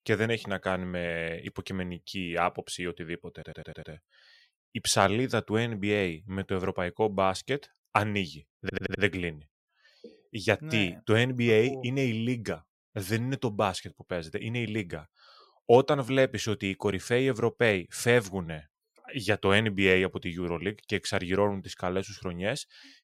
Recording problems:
audio stuttering; at 3.5 s and at 8.5 s

